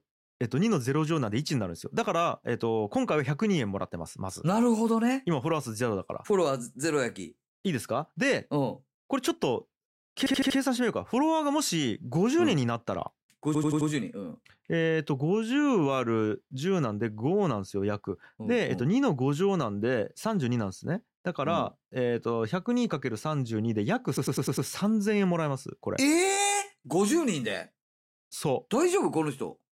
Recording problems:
audio stuttering; at 10 s, at 13 s and at 24 s

